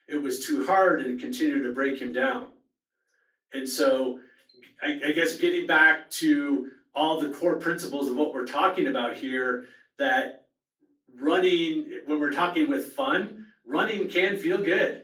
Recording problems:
off-mic speech; far
room echo; slight; dies away in 0.3 s
garbled, watery; slightly; nothing above 18 kHz
thin; very slightly; fading below 300 Hz

